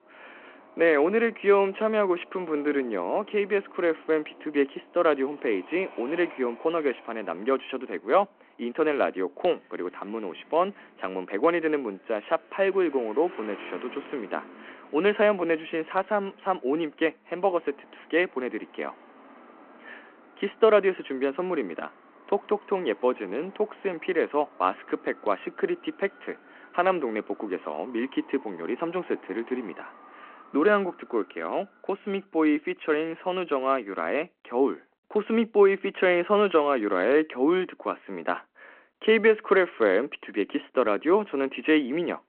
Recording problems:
phone-call audio
traffic noise; faint; until 31 s; 25 dB below the speech

